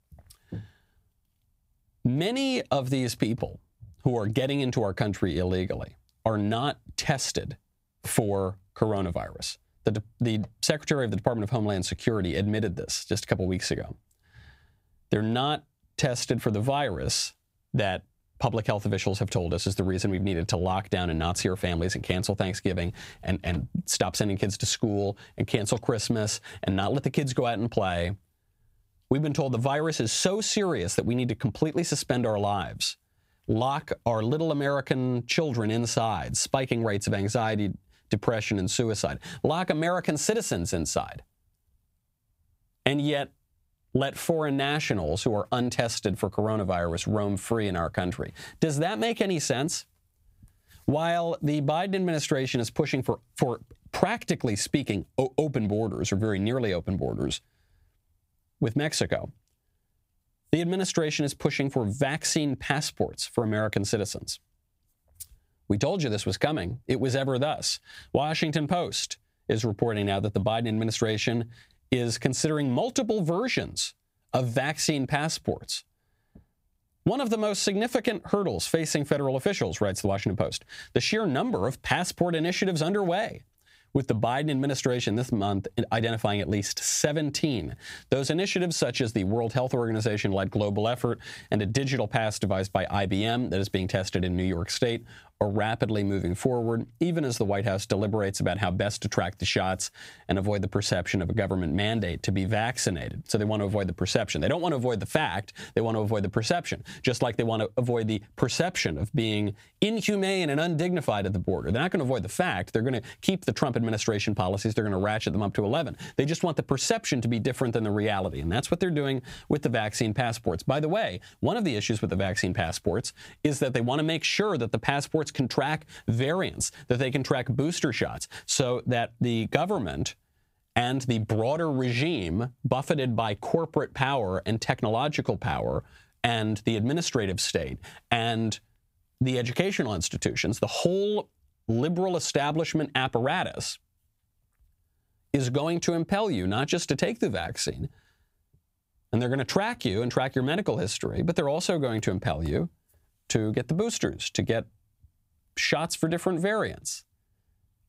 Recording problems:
squashed, flat; somewhat

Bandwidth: 15.5 kHz